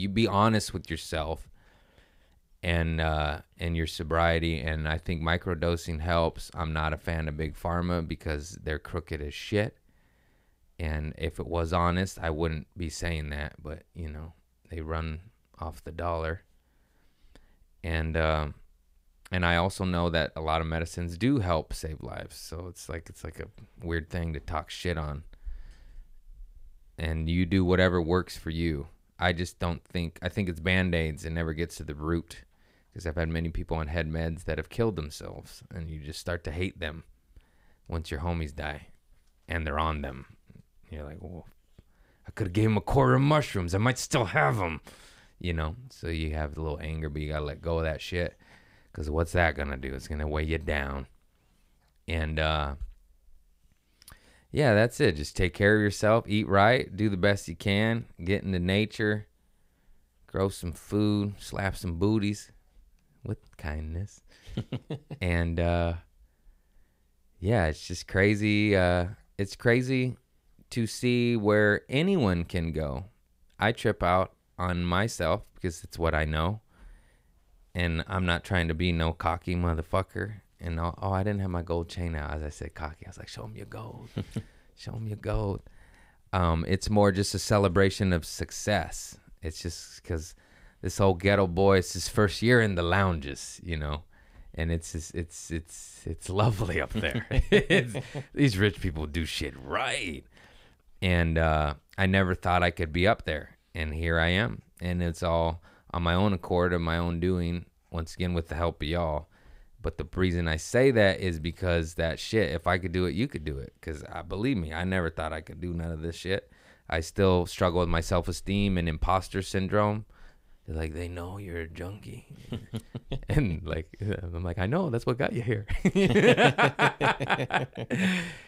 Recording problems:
abrupt cut into speech; at the start

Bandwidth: 15.5 kHz